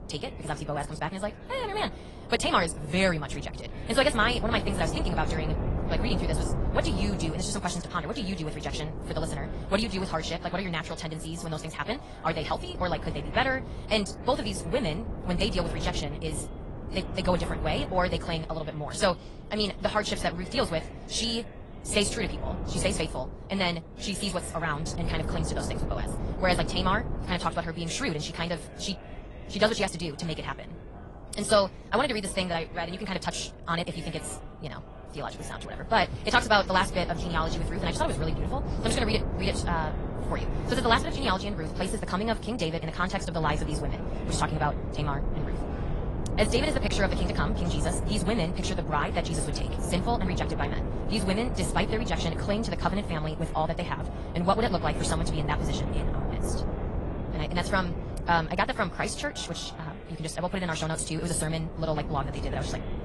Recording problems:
wrong speed, natural pitch; too fast; 1.7 times normal speed
garbled, watery; slightly; nothing above 10.5 kHz
wind noise on the microphone; occasional gusts; 10 dB below the speech
voice in the background; faint; throughout; 20 dB below the speech

